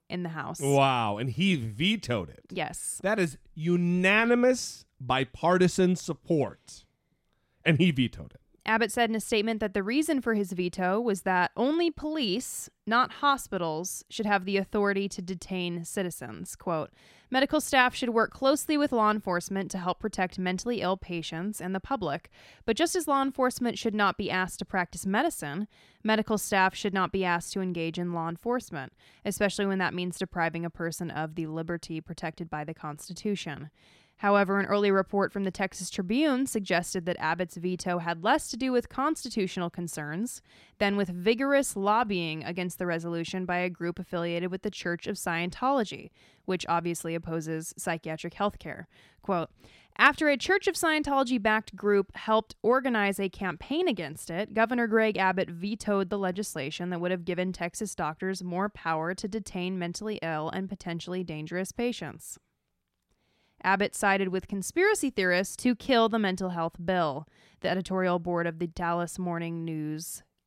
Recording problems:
none

